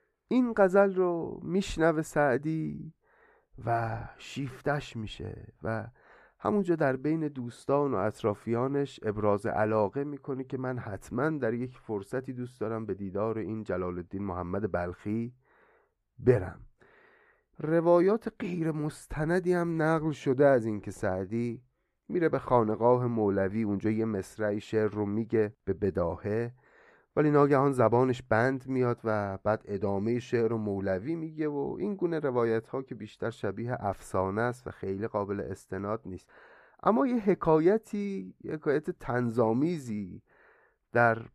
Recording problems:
muffled; slightly; fading above 3 kHz

